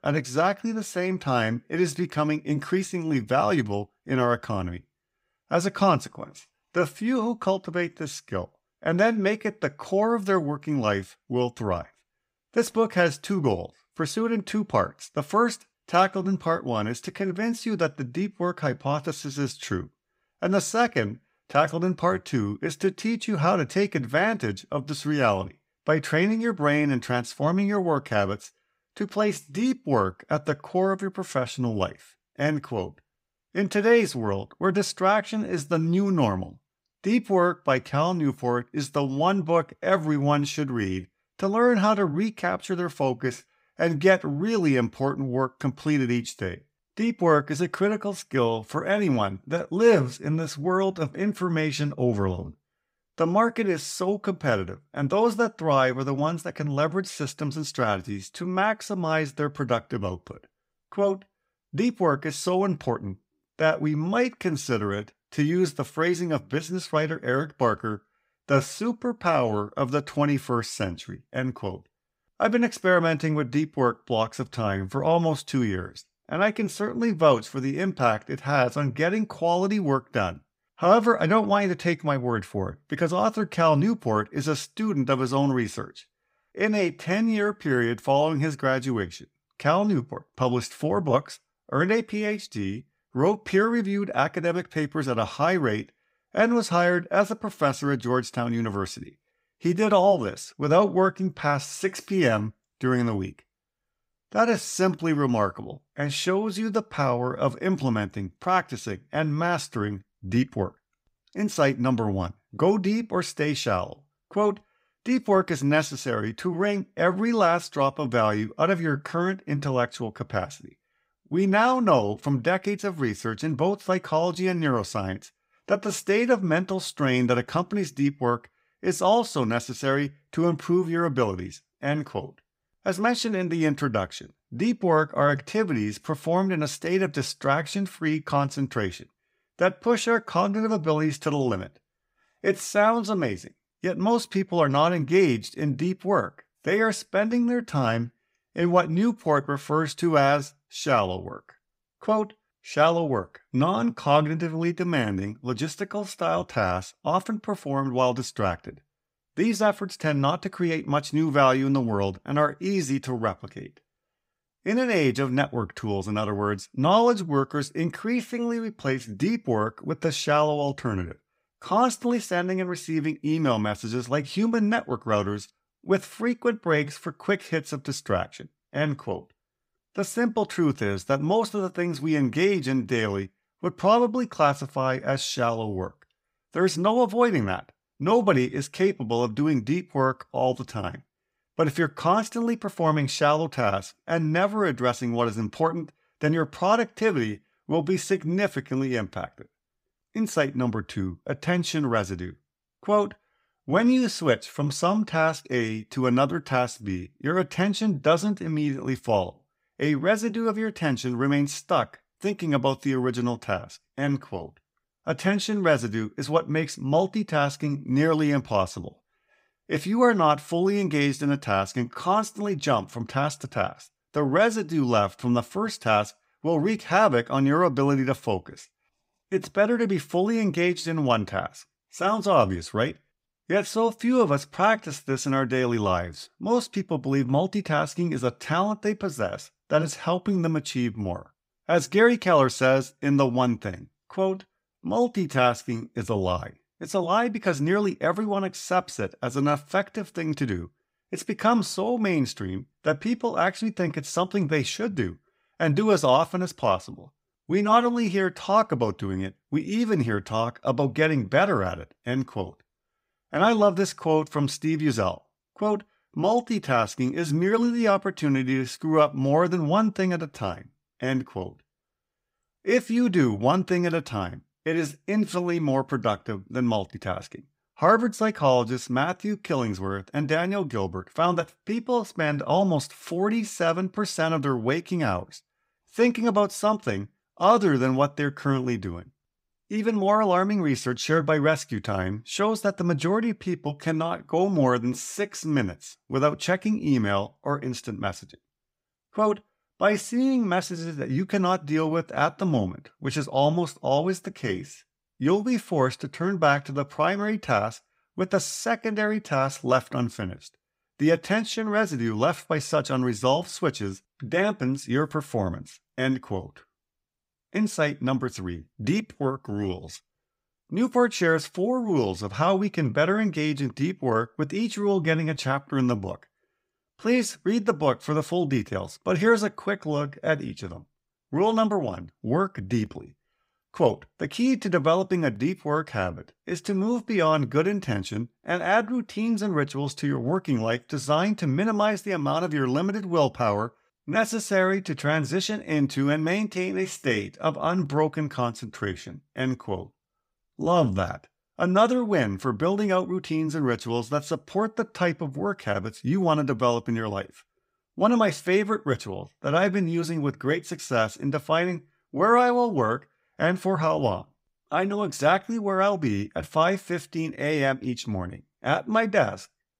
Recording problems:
none

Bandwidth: 15.5 kHz